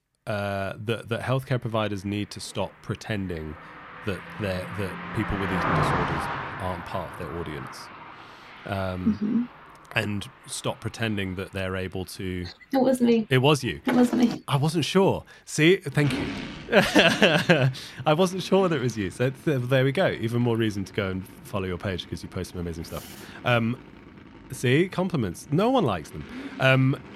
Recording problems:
traffic noise; noticeable; throughout; 10 dB below the speech

